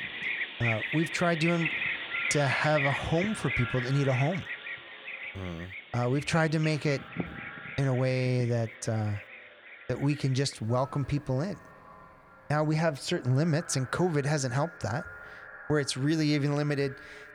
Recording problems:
echo of what is said; noticeable; throughout; 280 ms later, 20 dB below the speech
animal sounds; loud; throughout; 5 dB below the speech

